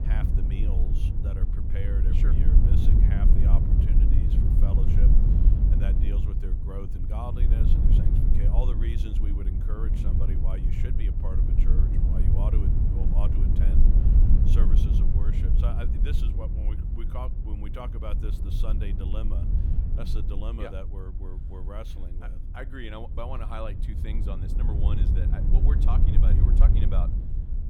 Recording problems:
wind noise on the microphone; heavy; 1 dB above the speech

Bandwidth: 18 kHz